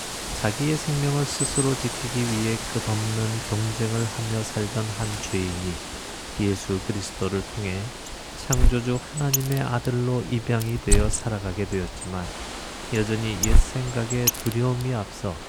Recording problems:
animal sounds; loud; throughout; 2 dB below the speech

